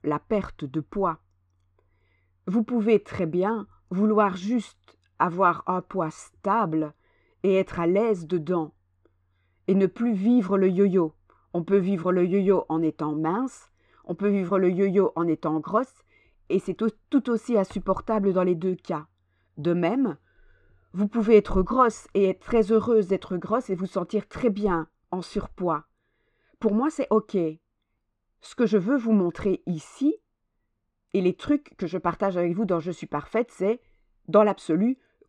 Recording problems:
muffled; very; fading above 2.5 kHz

